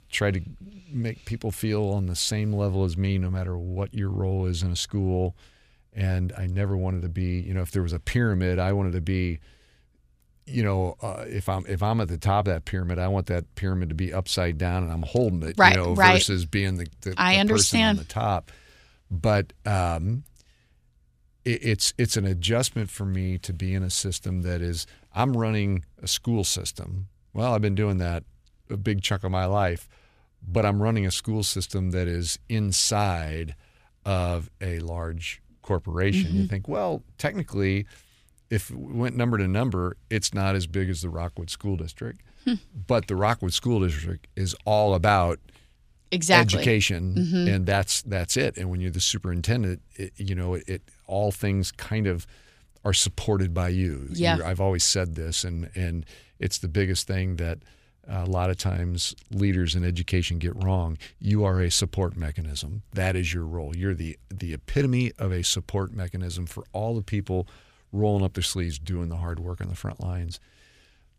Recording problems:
none

